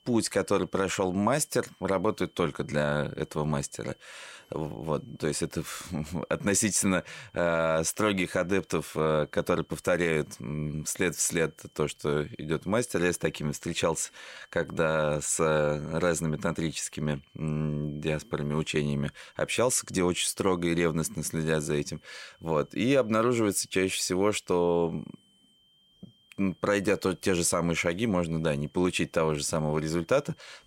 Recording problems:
high-pitched whine; faint; throughout; 3 kHz, 35 dB below the speech

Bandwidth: 16 kHz